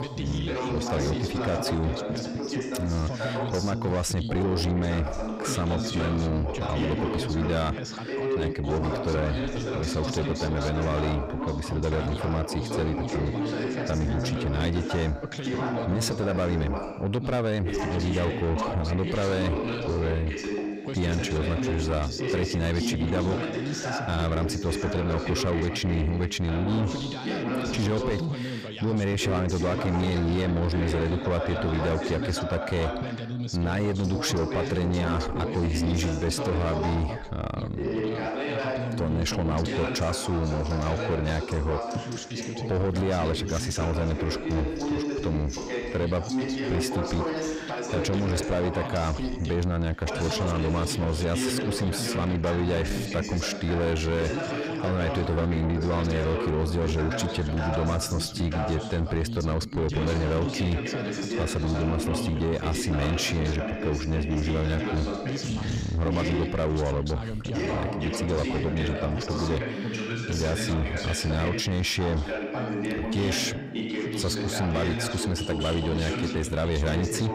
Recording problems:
distortion; slight; 10 dB below the speech
background chatter; loud; throughout; 2 voices, 3 dB below the speech

